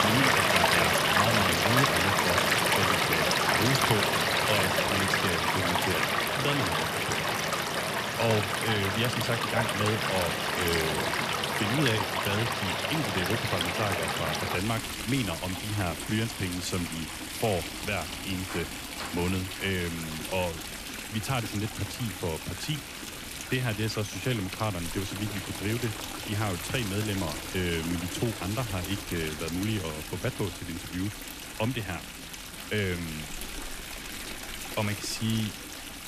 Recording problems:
rain or running water; very loud; throughout; 3 dB above the speech

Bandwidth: 14.5 kHz